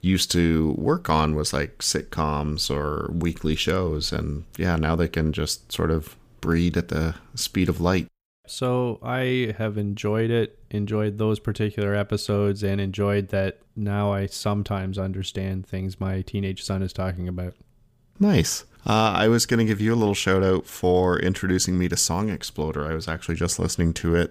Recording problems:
none

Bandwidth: 15 kHz